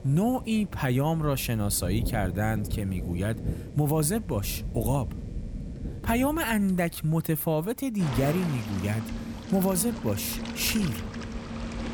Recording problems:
rain or running water; loud; throughout; 9 dB below the speech

